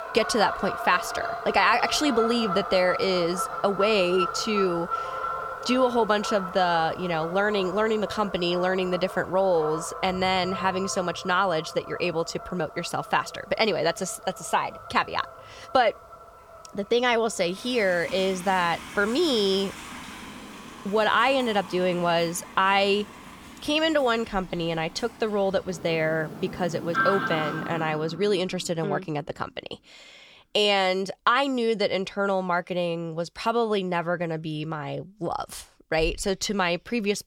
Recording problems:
animal sounds; loud; until 28 s; 9 dB below the speech

